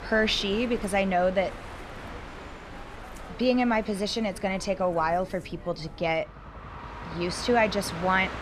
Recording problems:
train or aircraft noise; noticeable; throughout; 15 dB below the speech

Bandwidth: 14 kHz